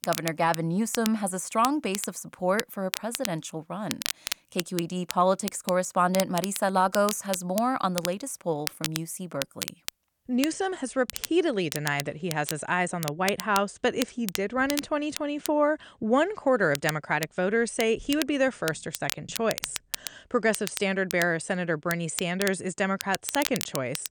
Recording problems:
crackle, like an old record; loud; 8 dB below the speech

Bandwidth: 18 kHz